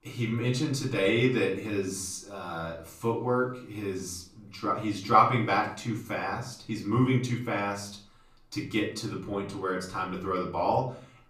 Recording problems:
off-mic speech; far
room echo; slight; dies away in 0.5 s

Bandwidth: 14.5 kHz